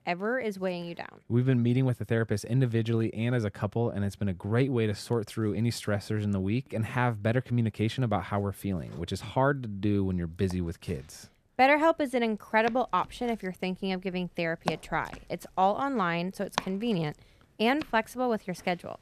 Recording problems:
household noises; noticeable; throughout; 15 dB below the speech

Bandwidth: 14 kHz